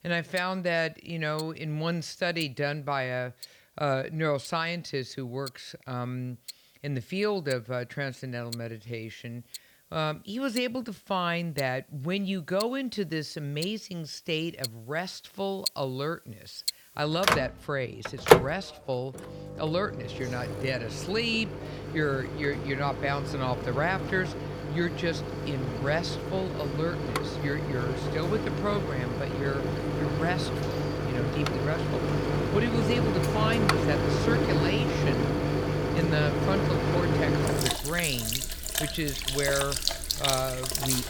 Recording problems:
household noises; very loud; throughout; 2 dB above the speech

